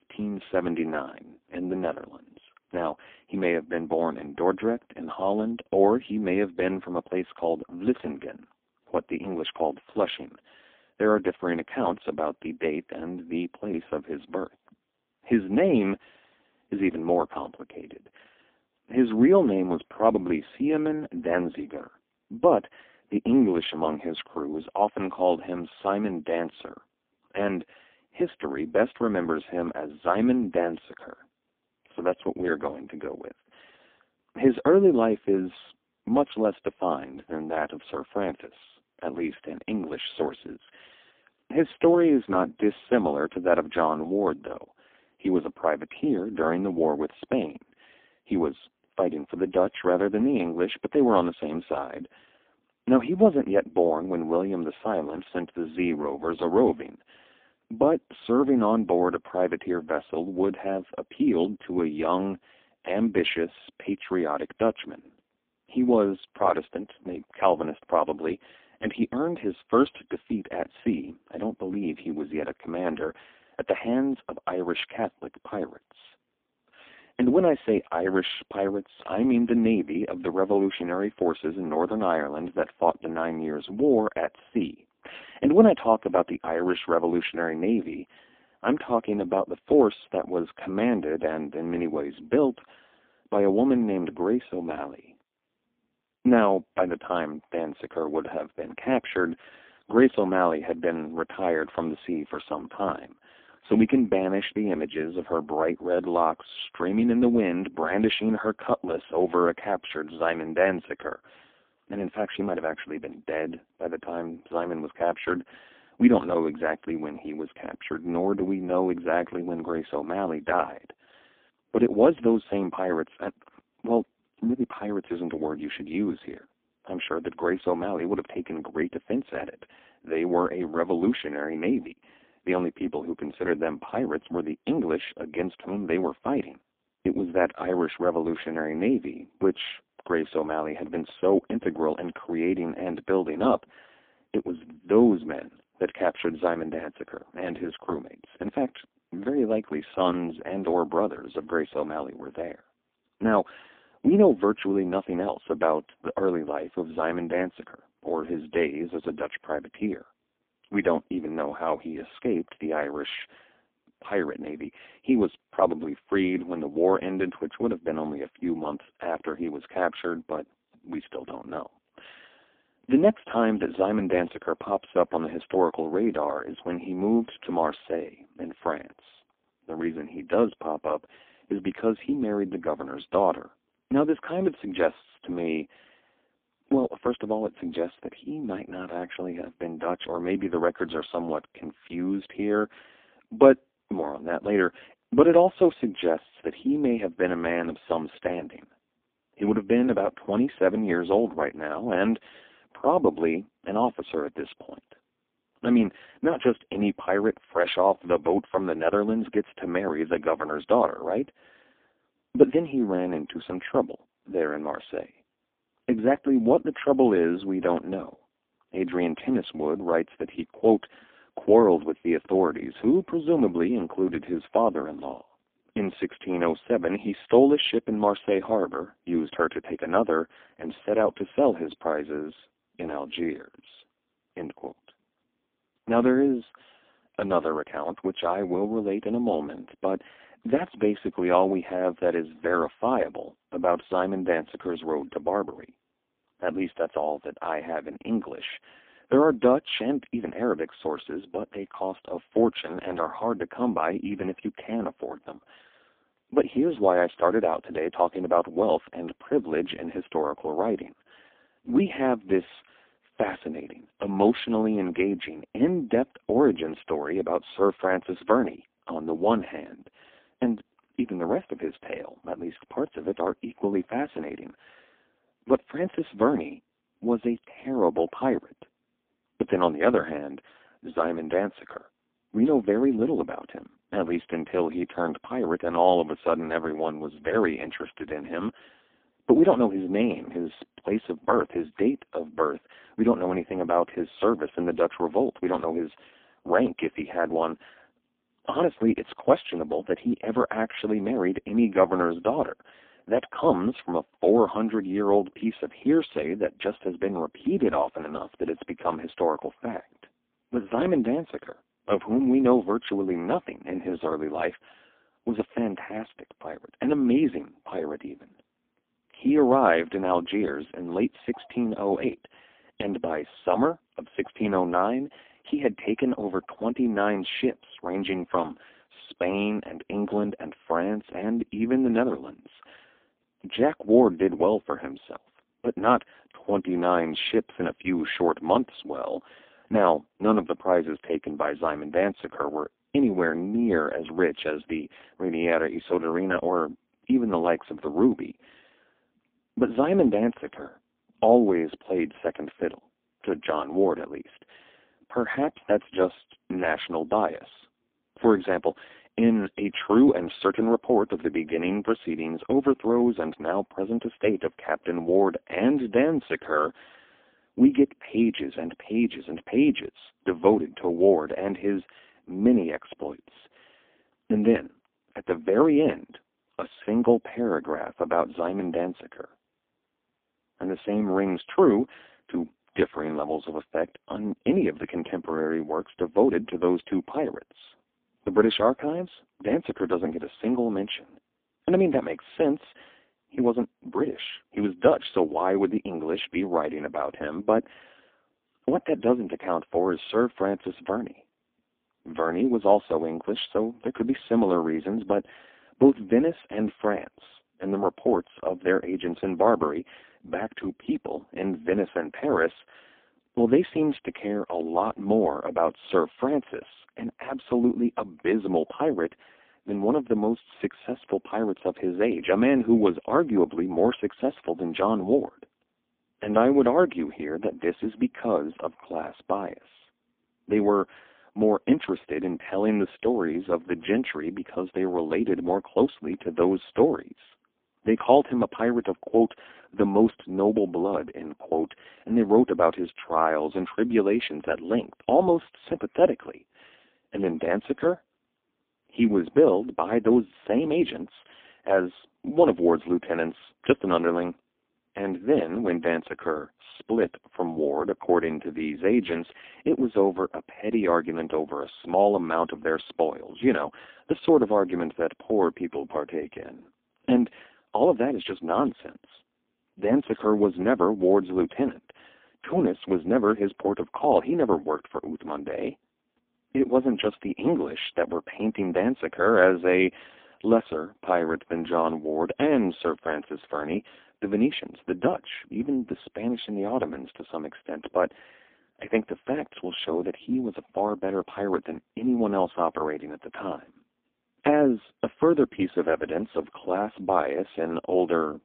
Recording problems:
phone-call audio; poor line

